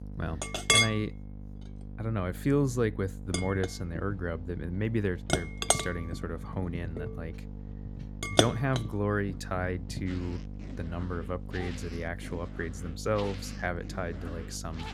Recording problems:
household noises; very loud; throughout; 3 dB above the speech
electrical hum; noticeable; throughout; 50 Hz, 15 dB below the speech

